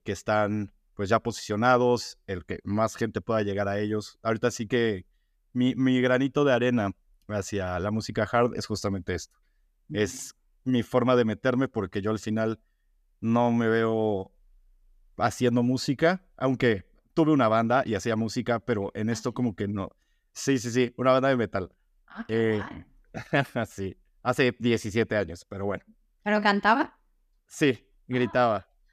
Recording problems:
none

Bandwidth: 14.5 kHz